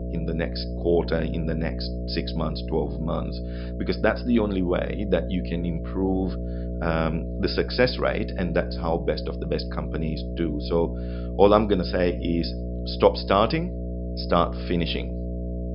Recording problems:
high frequencies cut off; noticeable; nothing above 5.5 kHz
electrical hum; noticeable; throughout; 60 Hz, 15 dB below the speech

